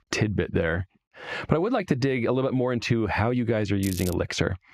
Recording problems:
squashed, flat; heavily
muffled; very slightly; fading above 4 kHz
crackling; noticeable; at 4 s; 10 dB below the speech

